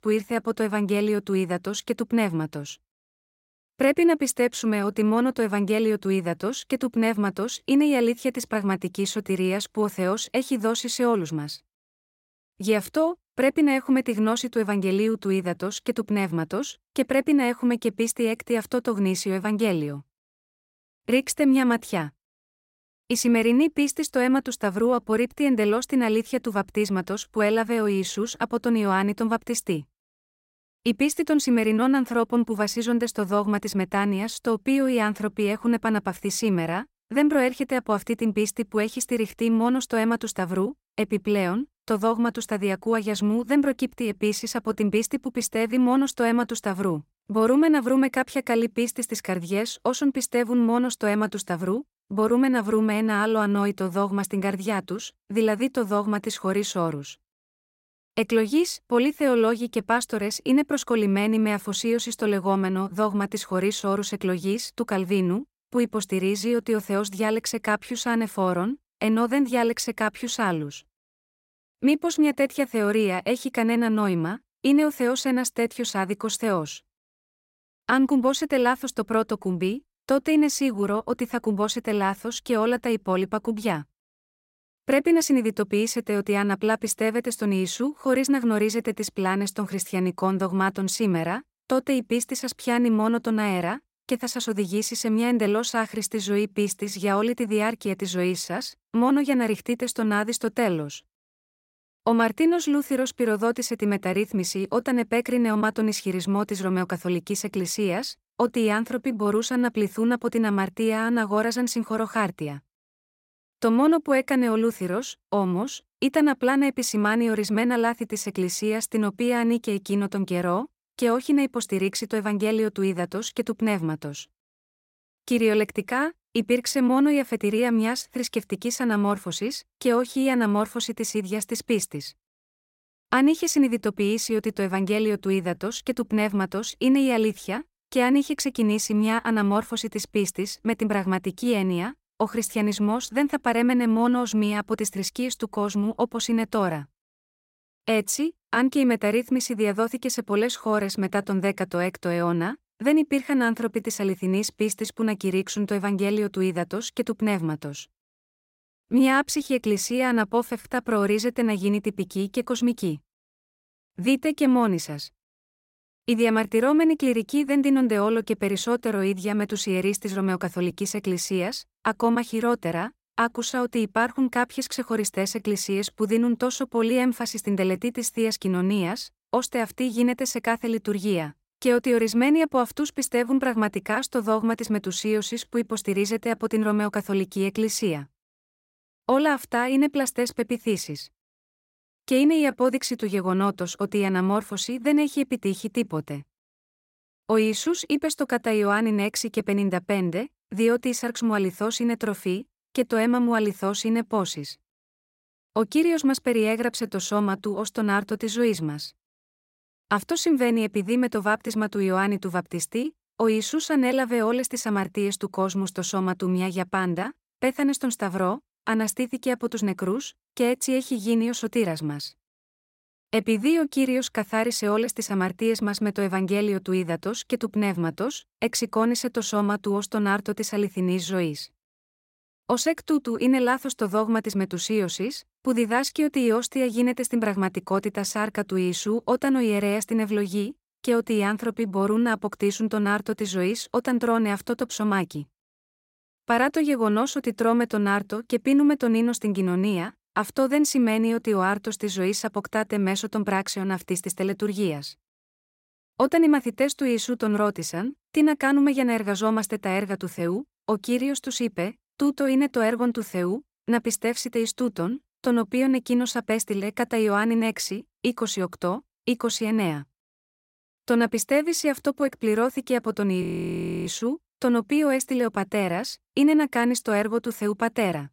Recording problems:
audio freezing; at 4:33 for 0.5 s

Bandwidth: 16 kHz